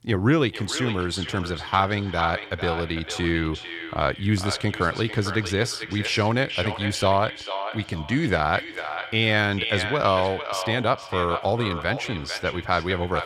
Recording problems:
echo of what is said; strong; throughout; 450 ms later, 8 dB below the speech

